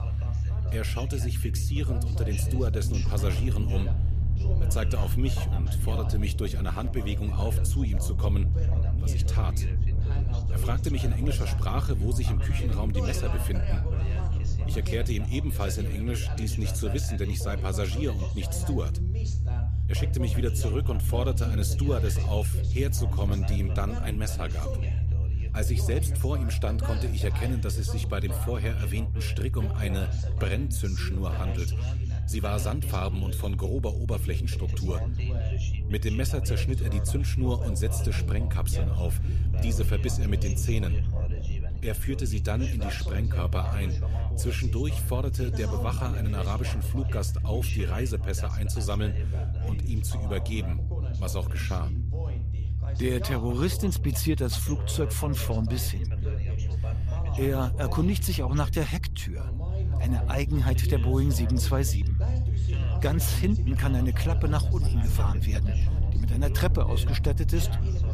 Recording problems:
low rumble; loud; throughout; 9 dB below the speech
background chatter; noticeable; throughout; 2 voices, 10 dB below the speech

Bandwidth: 14.5 kHz